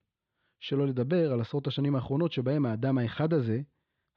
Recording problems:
muffled; slightly; fading above 3.5 kHz

